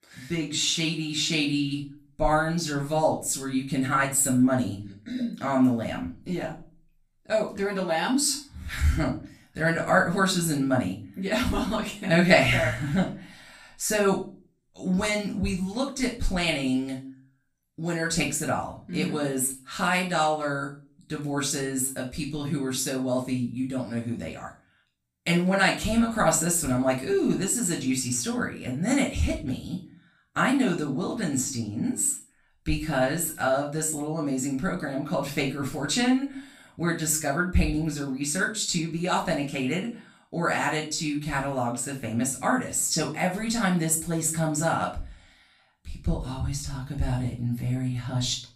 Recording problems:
off-mic speech; far
room echo; slight; dies away in 0.3 s

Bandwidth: 15 kHz